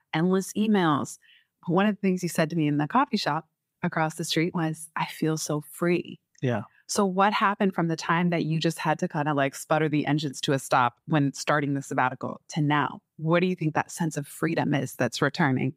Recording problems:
none

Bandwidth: 15.5 kHz